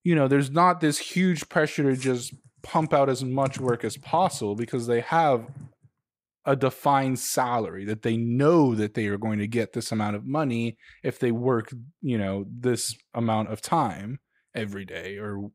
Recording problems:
none

